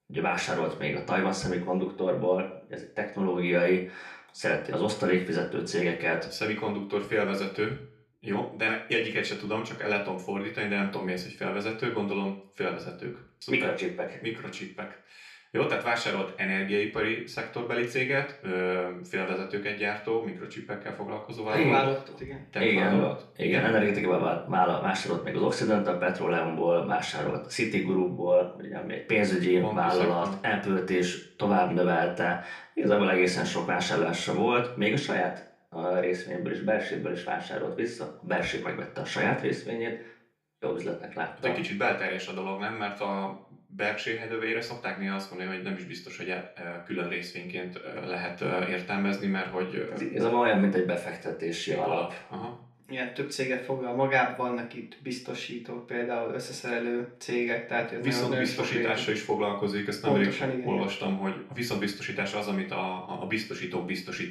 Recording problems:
off-mic speech; far
room echo; slight; dies away in 0.4 s

